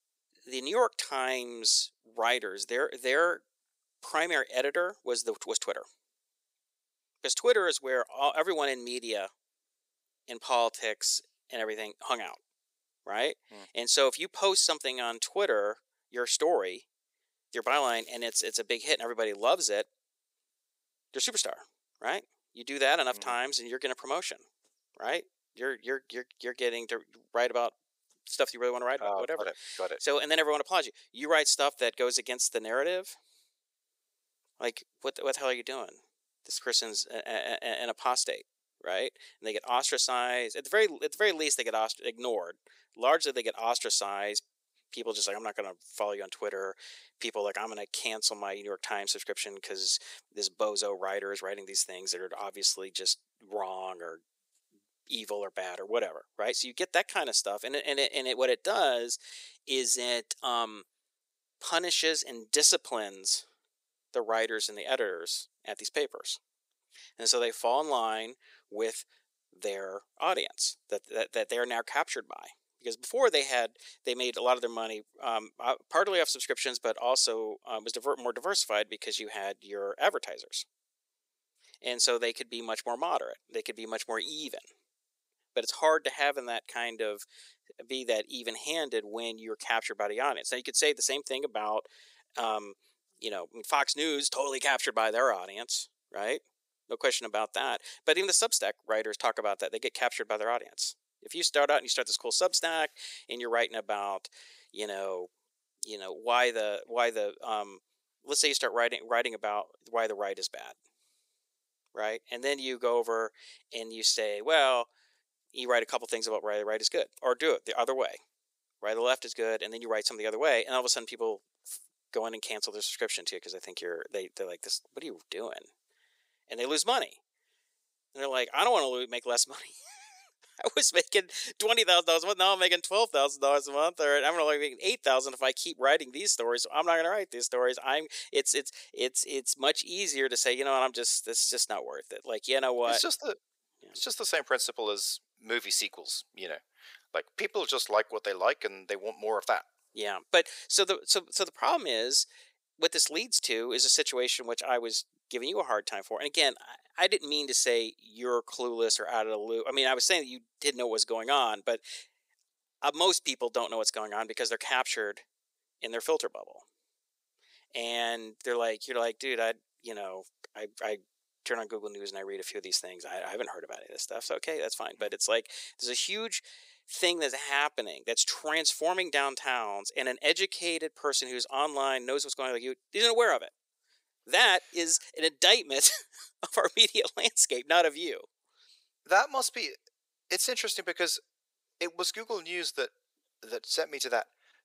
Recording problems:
thin; very; fading below 450 Hz
crackling; faint; from 18 to 19 s; 25 dB below the speech

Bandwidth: 15.5 kHz